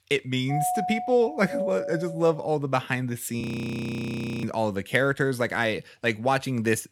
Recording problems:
doorbell; noticeable; until 2.5 s; peak 1 dB below the speech
audio freezing; at 3.5 s for 1 s

